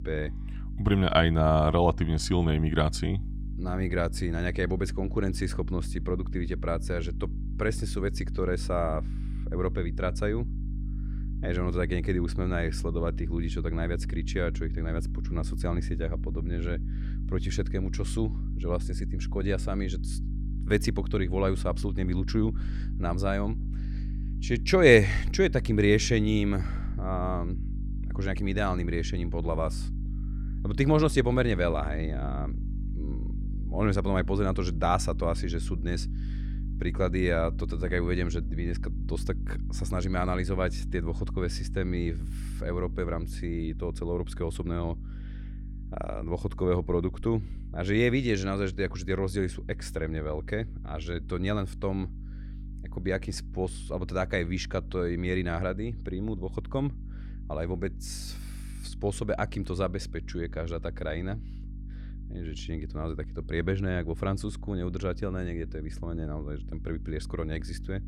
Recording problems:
electrical hum; noticeable; throughout; 50 Hz, 20 dB below the speech

